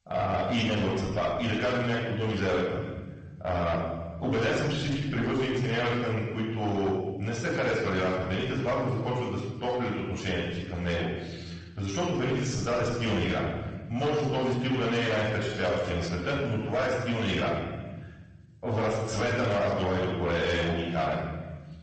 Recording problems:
off-mic speech; far
room echo; noticeable; dies away in 1.3 s
distortion; slight; 10 dB below the speech
garbled, watery; slightly; nothing above 8 kHz

